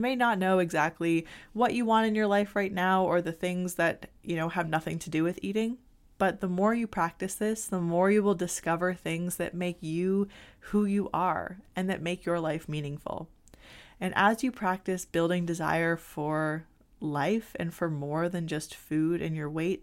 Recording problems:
abrupt cut into speech; at the start

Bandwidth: 16 kHz